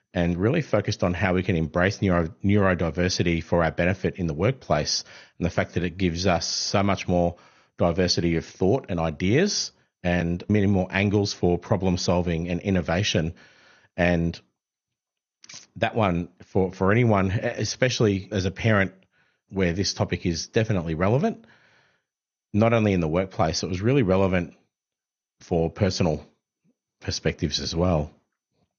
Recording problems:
garbled, watery; slightly; nothing above 6.5 kHz

